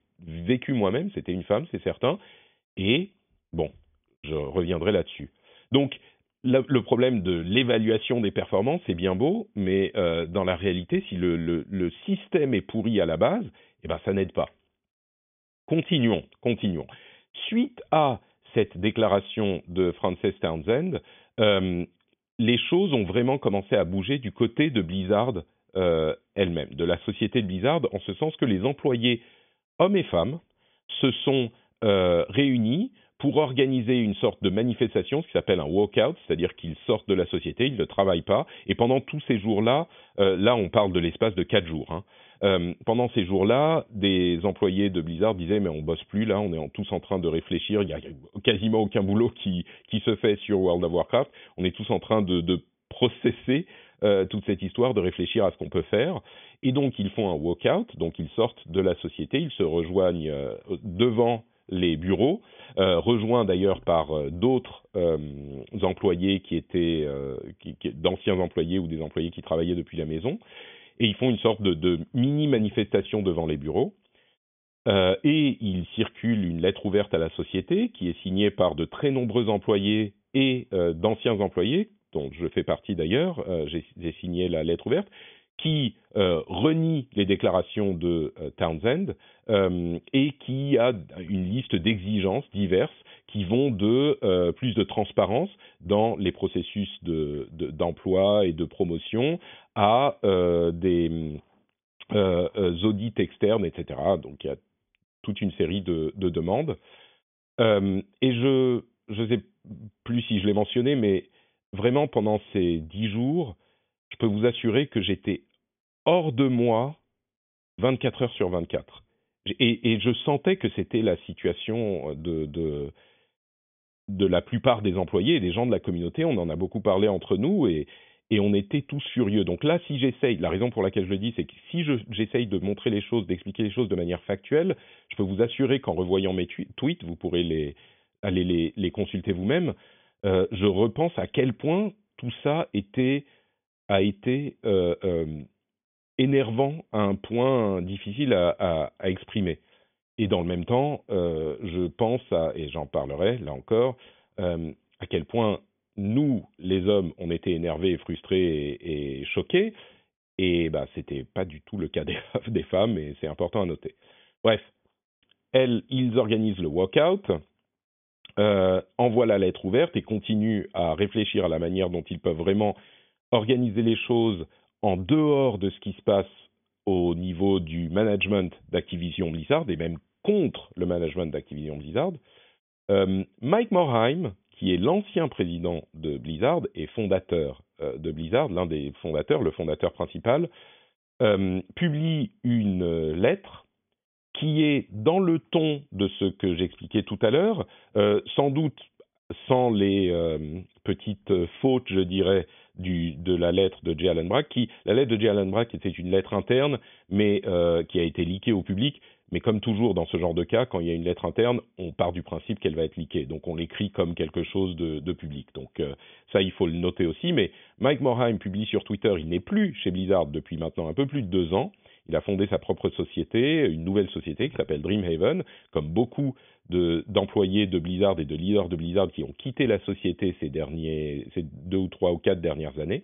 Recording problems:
high frequencies cut off; severe; nothing above 3.5 kHz

